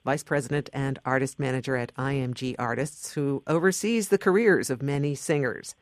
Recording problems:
none

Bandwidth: 14.5 kHz